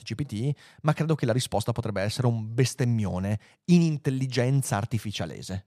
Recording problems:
none

